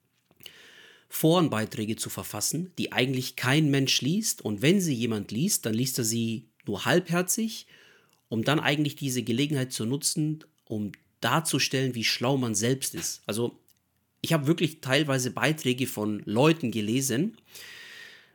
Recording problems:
none

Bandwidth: 18 kHz